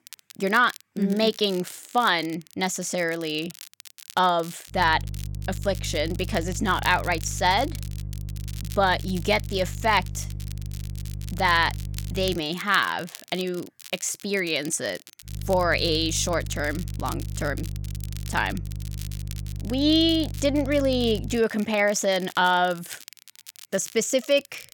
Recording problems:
crackle, like an old record; noticeable; 20 dB below the speech
electrical hum; faint; from 4.5 to 12 s and from 15 to 21 s; 50 Hz, 25 dB below the speech

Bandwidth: 18 kHz